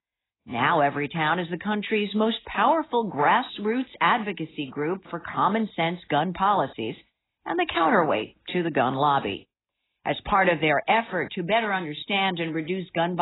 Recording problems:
garbled, watery; badly; nothing above 4 kHz
abrupt cut into speech; at the end

